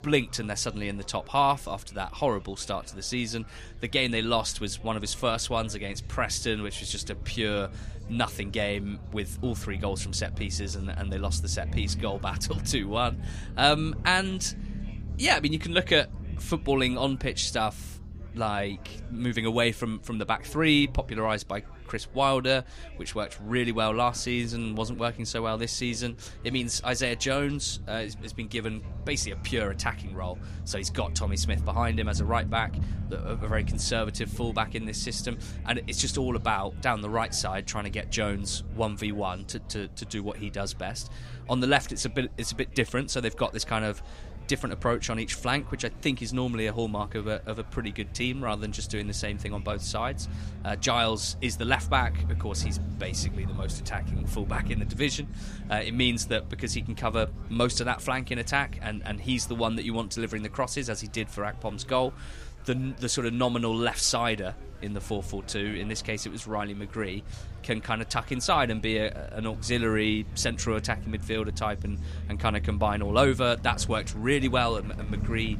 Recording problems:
murmuring crowd; faint; throughout; 25 dB below the speech
low rumble; faint; throughout; 20 dB below the speech

